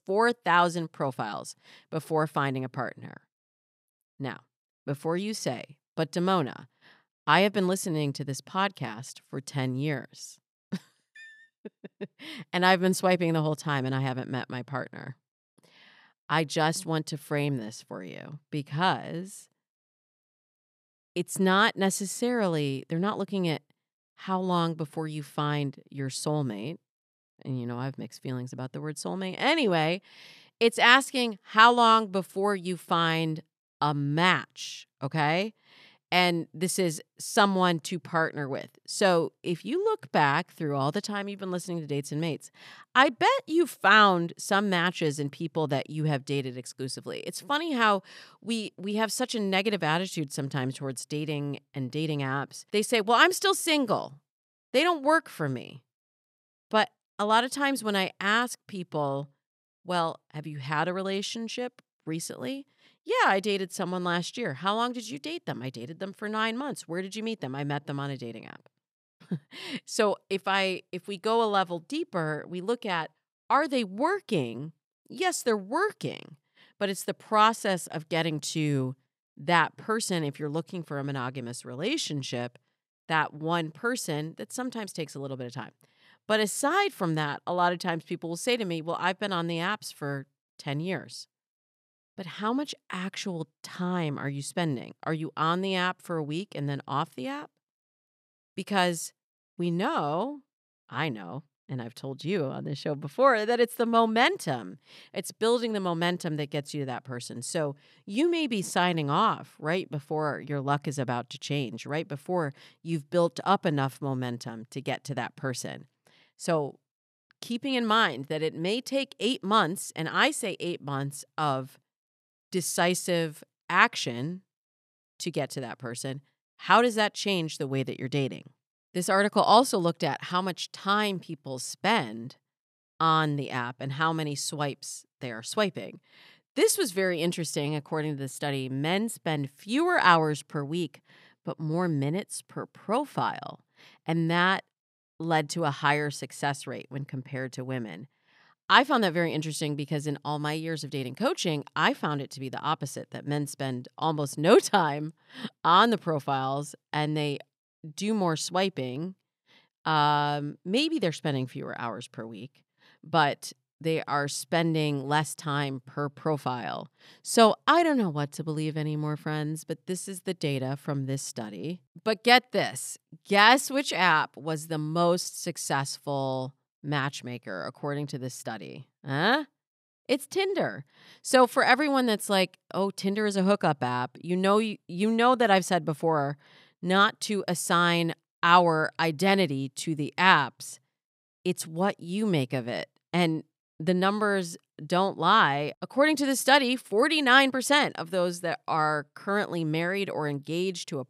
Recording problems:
none

